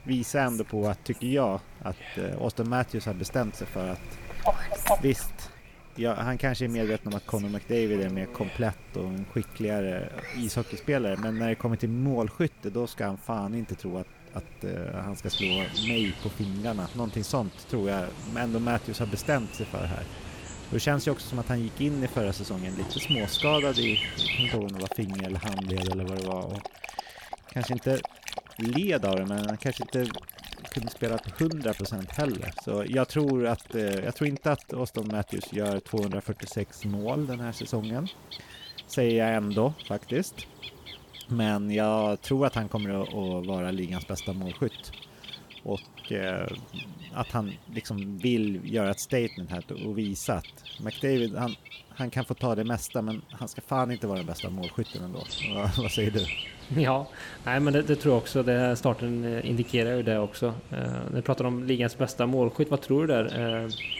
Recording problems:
animal sounds; loud; throughout; 7 dB below the speech

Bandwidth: 18 kHz